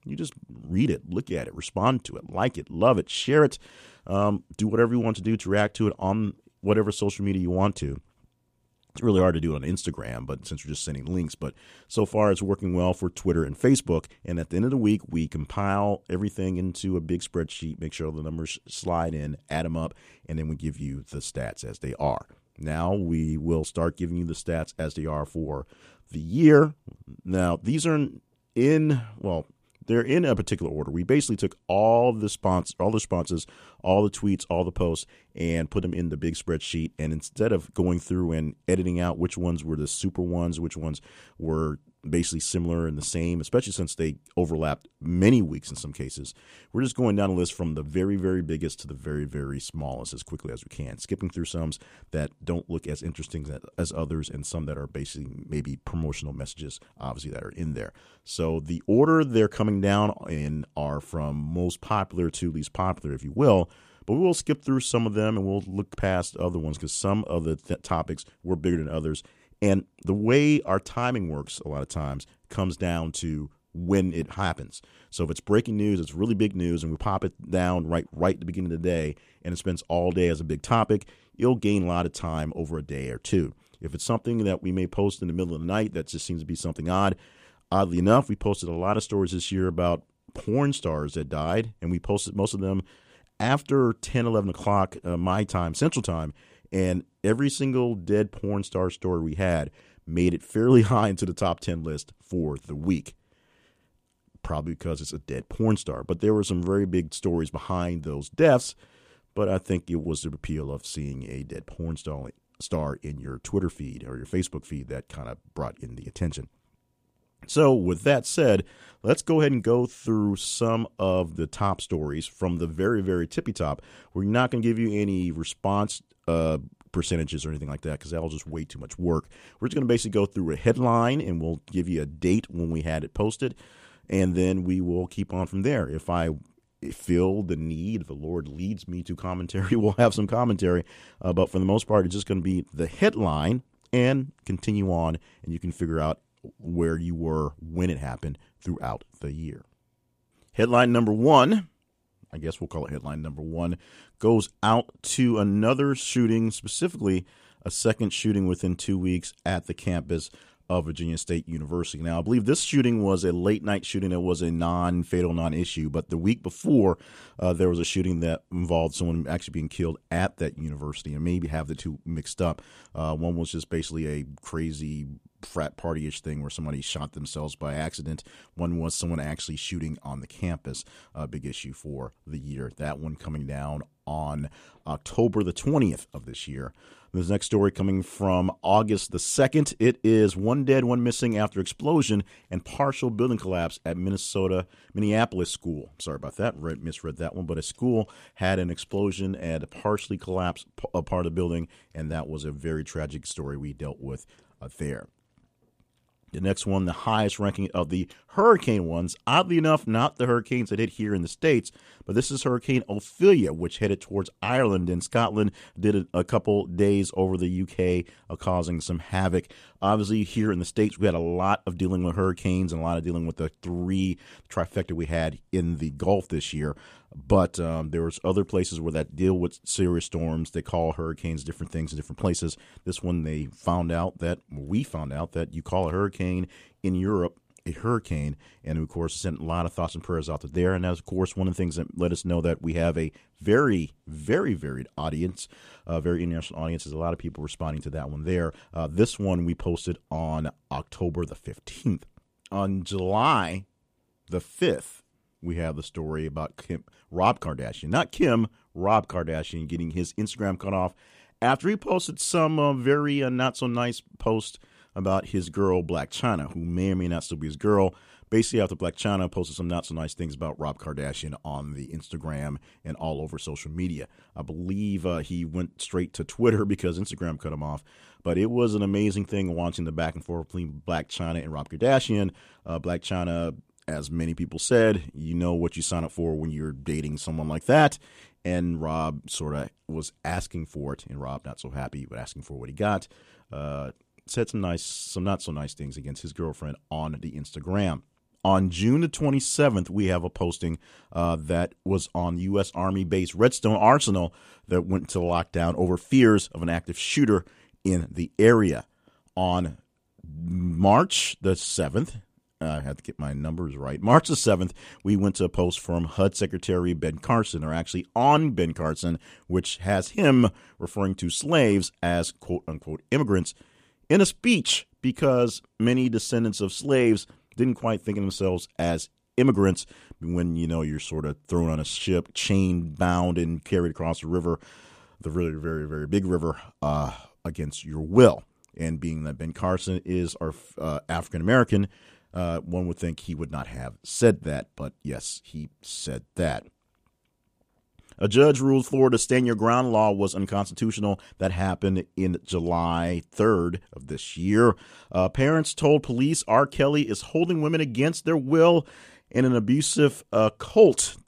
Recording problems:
none

